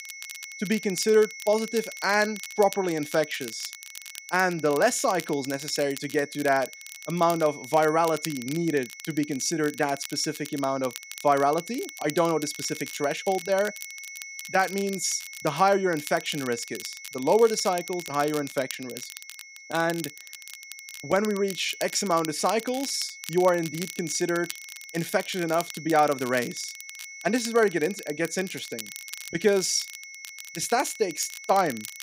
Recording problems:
high-pitched whine; noticeable; throughout; 2 kHz, 15 dB below the speech
crackle, like an old record; noticeable; 15 dB below the speech

